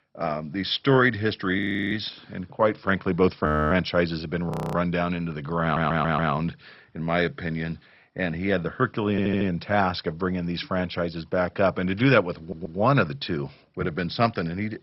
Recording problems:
garbled, watery; badly; nothing above 15 kHz
audio freezing; at 1.5 s, at 3.5 s and at 4.5 s
audio stuttering; at 5.5 s, at 9 s and at 12 s

